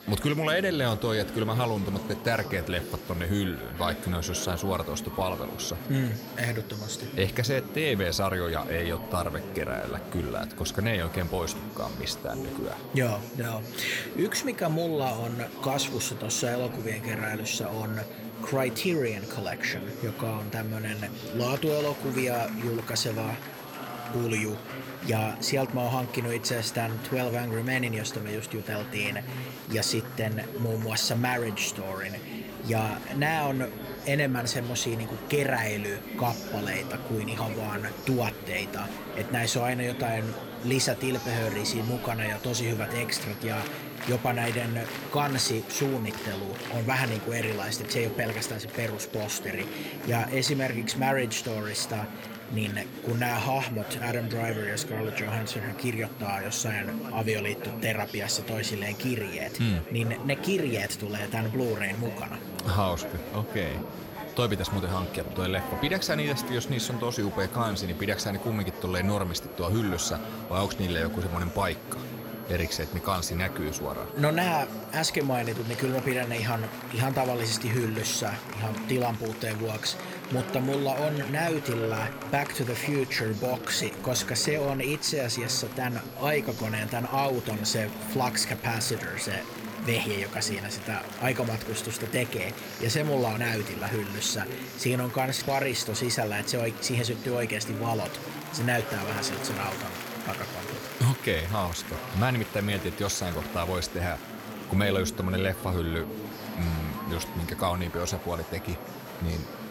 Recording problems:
chatter from many people; loud; throughout; 9 dB below the speech
high-pitched whine; faint; throughout; 11.5 kHz, 20 dB below the speech

